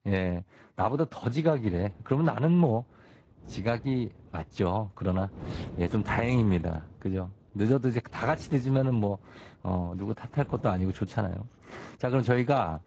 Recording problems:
garbled, watery; slightly; nothing above 7.5 kHz
wind noise on the microphone; occasional gusts; from 1.5 s on; 20 dB below the speech

